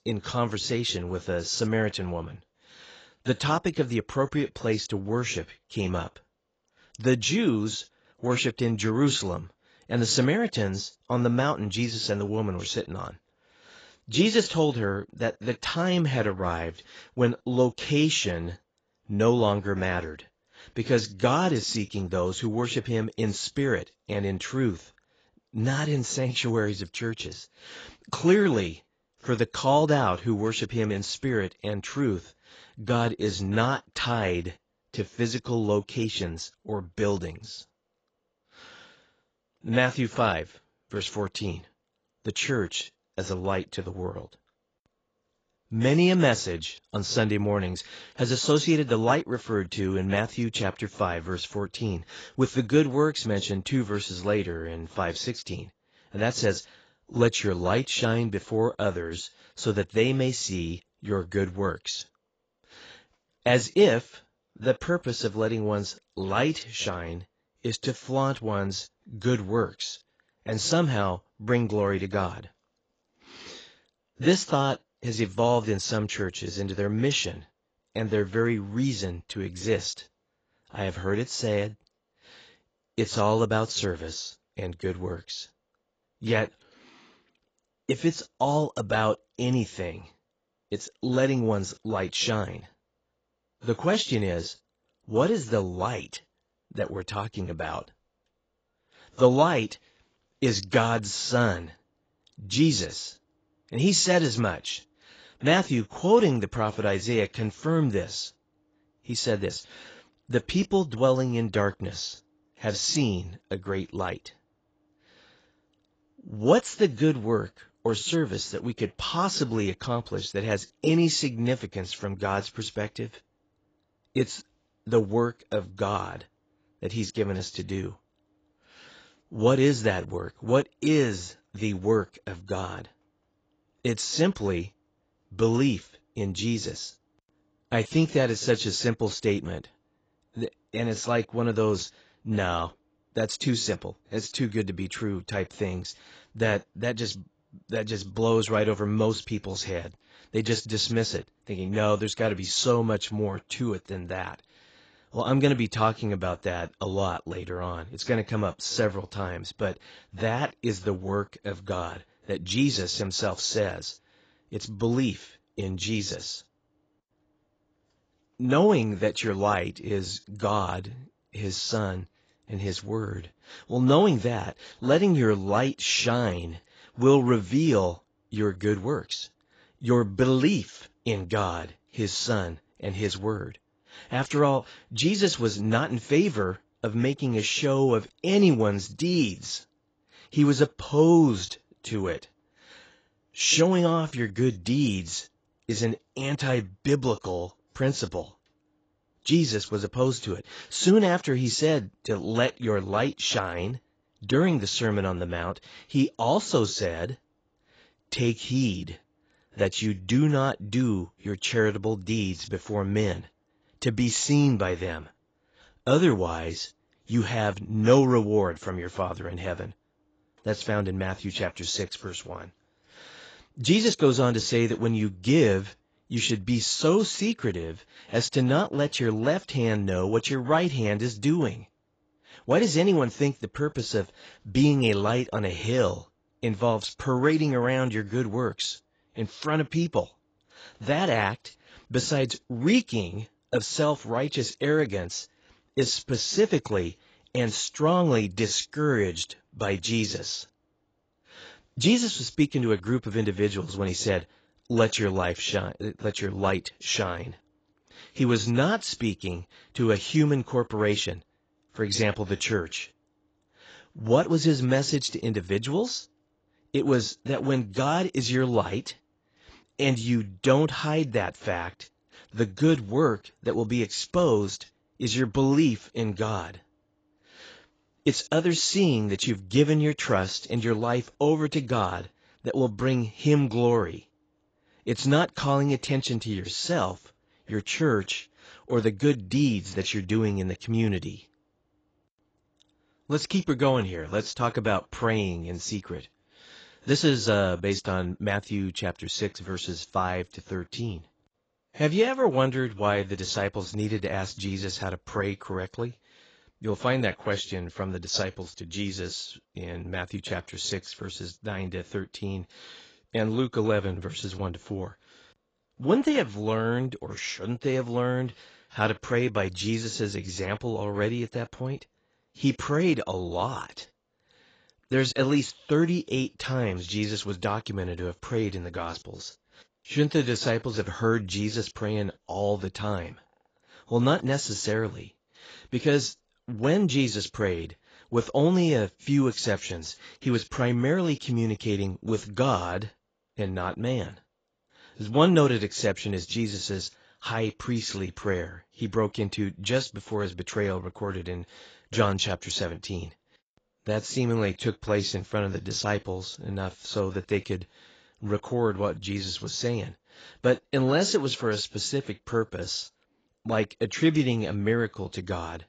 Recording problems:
garbled, watery; badly; nothing above 7.5 kHz

